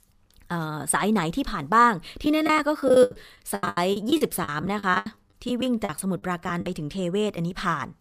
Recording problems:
choppy; very; from 2.5 to 6.5 s; 21% of the speech affected

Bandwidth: 15 kHz